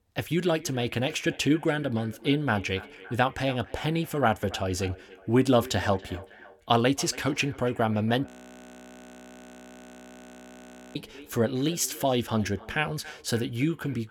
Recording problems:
echo of what is said; faint; throughout; 280 ms later, 20 dB below the speech
audio freezing; at 8.5 s for 2.5 s

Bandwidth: 18 kHz